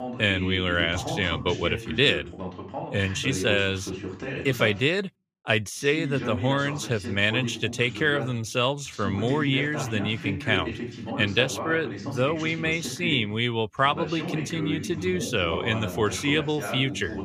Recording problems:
voice in the background; loud; throughout; 8 dB below the speech

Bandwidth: 14.5 kHz